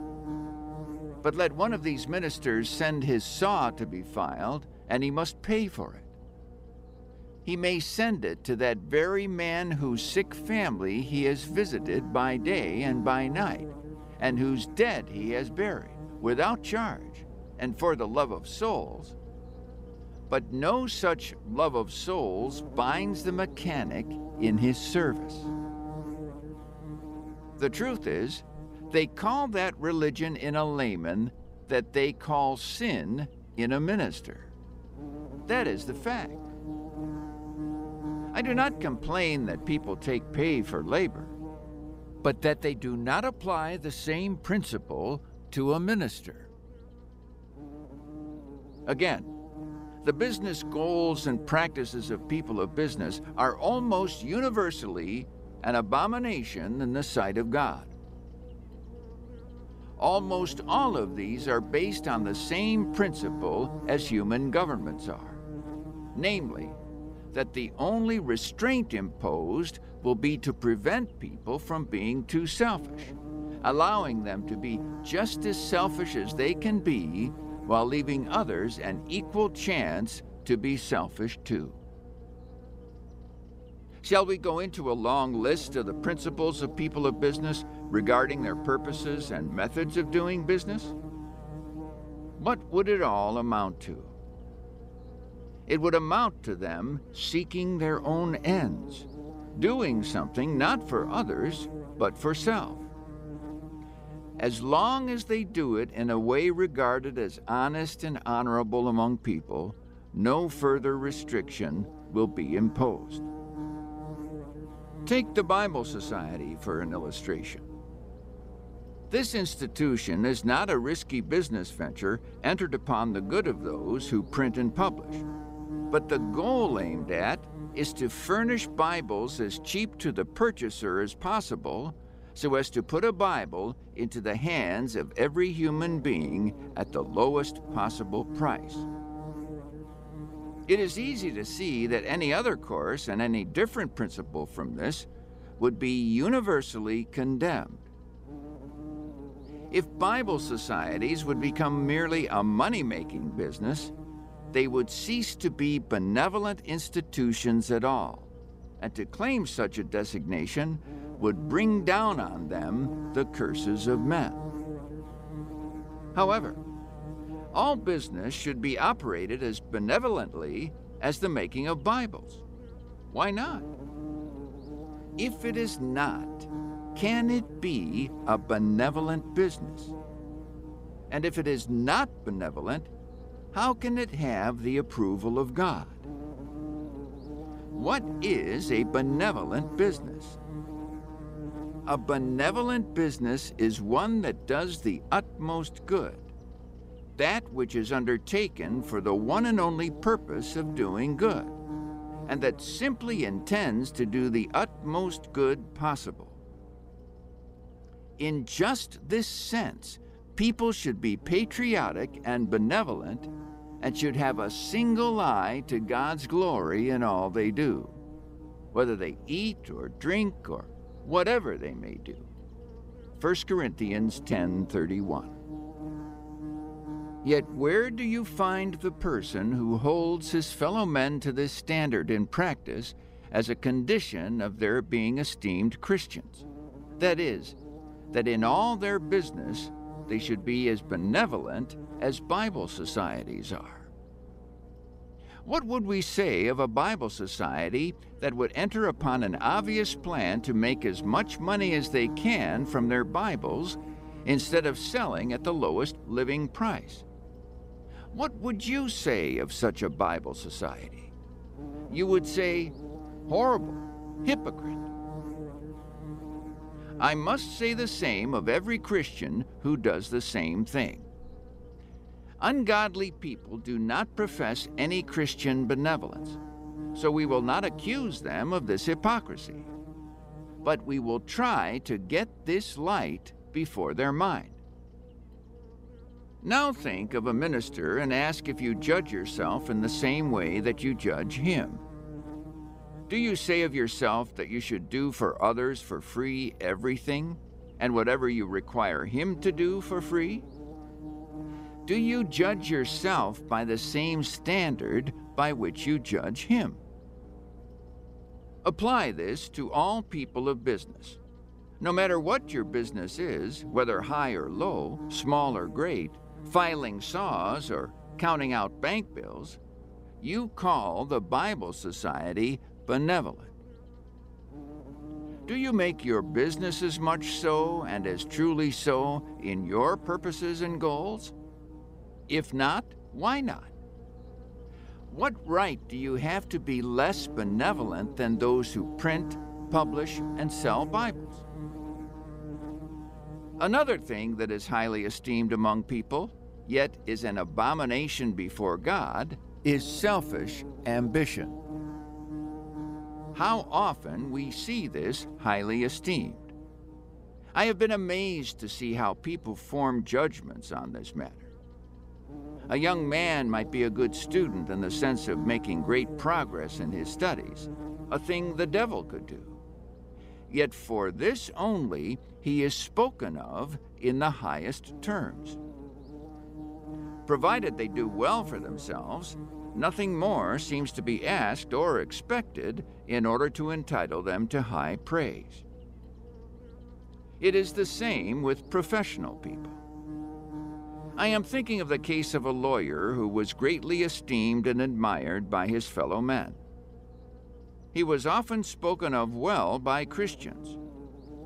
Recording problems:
electrical hum; noticeable; throughout; 60 Hz, 15 dB below the speech

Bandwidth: 15.5 kHz